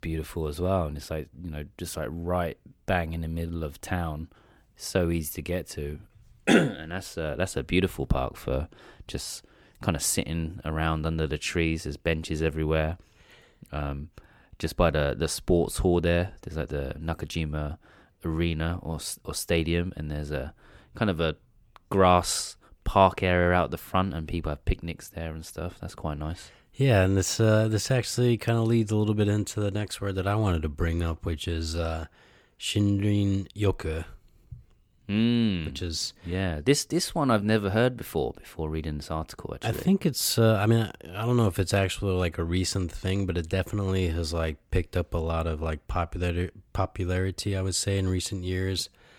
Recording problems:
none

